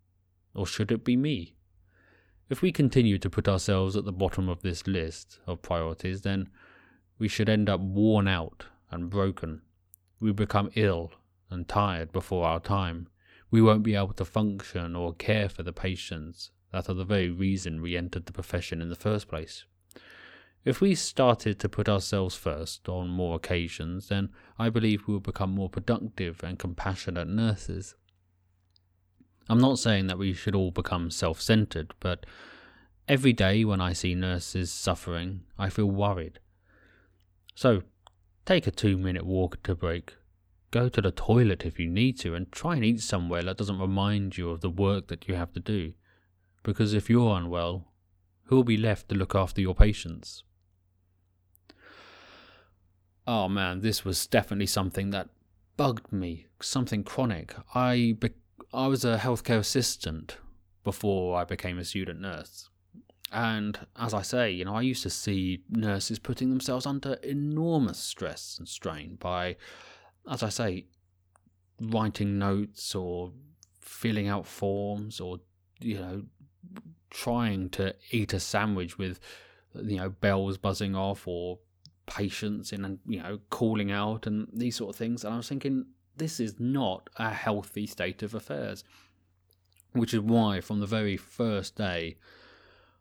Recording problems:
none

